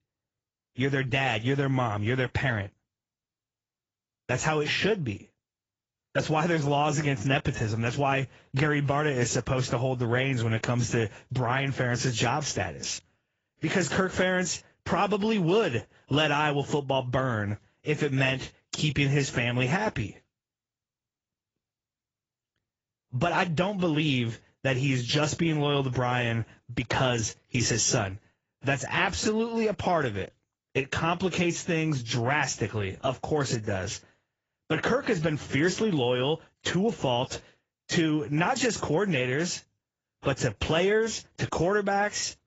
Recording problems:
high frequencies cut off; noticeable; nothing above 7.5 kHz
garbled, watery; slightly

